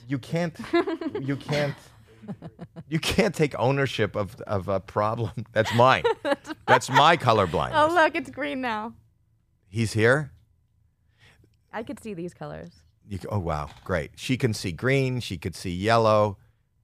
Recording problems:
none

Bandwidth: 15 kHz